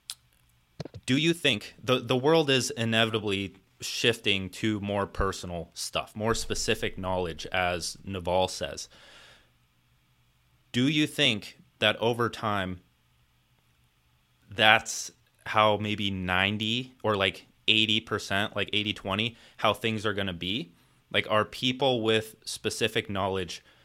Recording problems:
uneven, jittery; strongly; from 1 to 22 s

